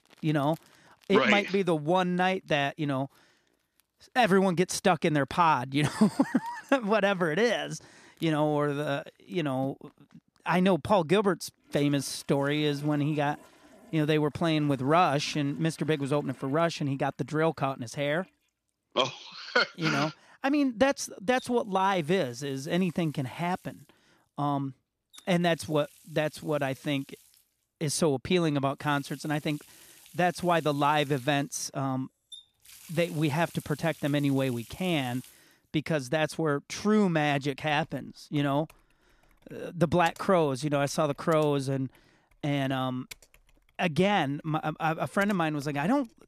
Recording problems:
household noises; faint; throughout; 25 dB below the speech

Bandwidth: 14.5 kHz